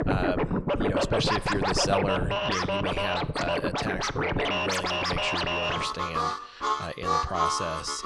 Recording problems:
background music; very loud; throughout; 5 dB above the speech

